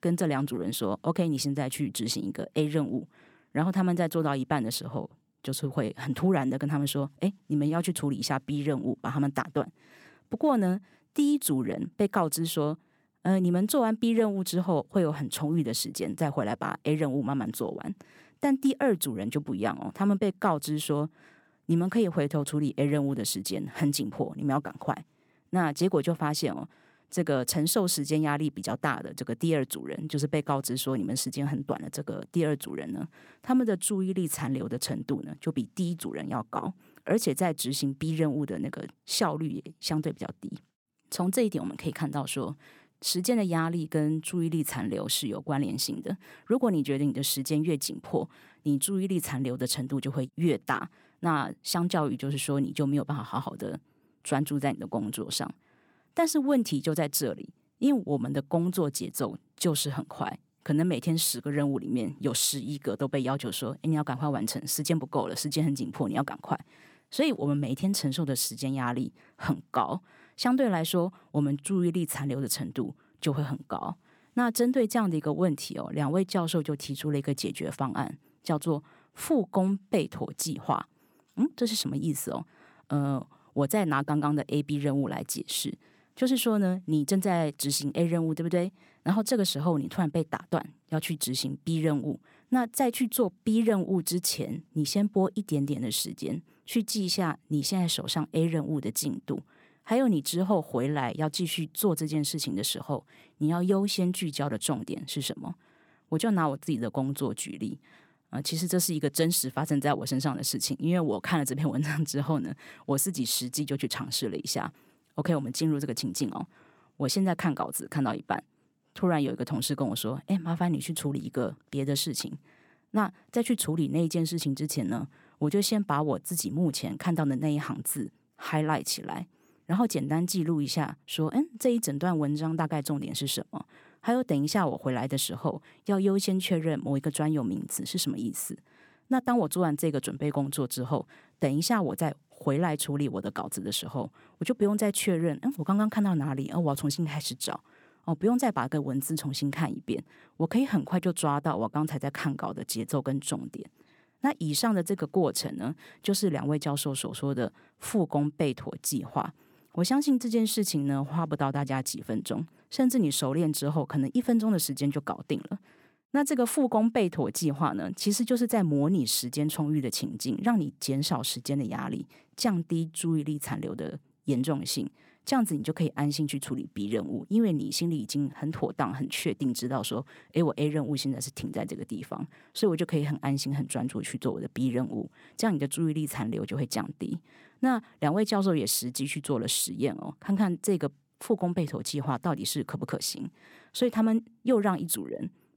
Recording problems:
none

